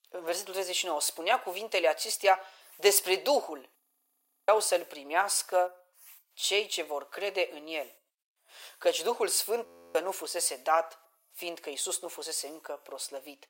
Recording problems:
thin; very; fading below 450 Hz
audio freezing; at 4 s for 0.5 s and at 9.5 s

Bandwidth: 16 kHz